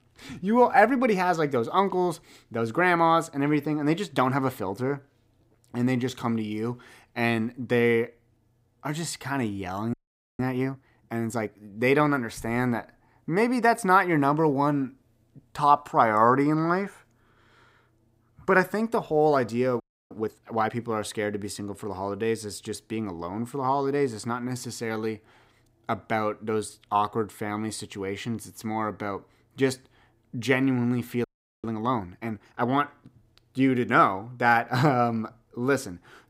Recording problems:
audio freezing; at 10 s, at 20 s and at 31 s

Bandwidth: 15.5 kHz